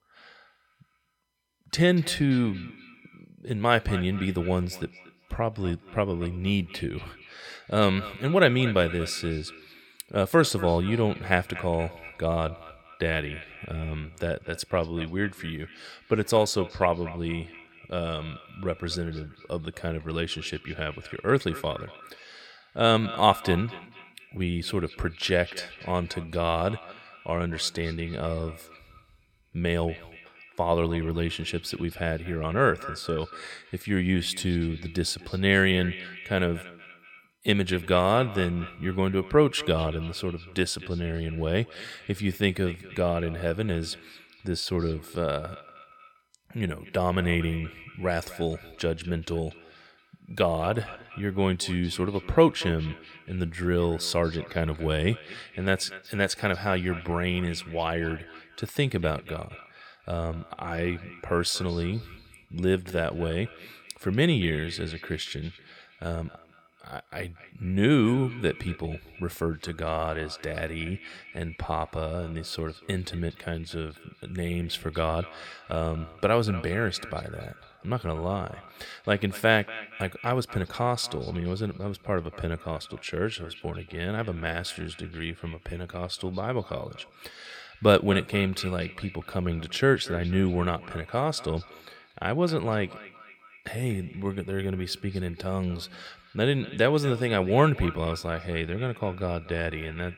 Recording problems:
echo of what is said; noticeable; throughout; 240 ms later, 15 dB below the speech

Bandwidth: 17 kHz